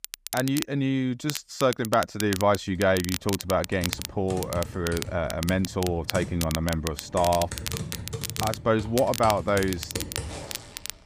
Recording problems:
crackle, like an old record; loud; 8 dB below the speech
household noises; noticeable; from 3 s on; 10 dB below the speech

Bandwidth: 15 kHz